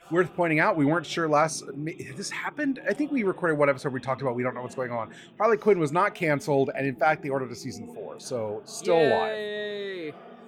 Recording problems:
voice in the background; faint; throughout; 20 dB below the speech

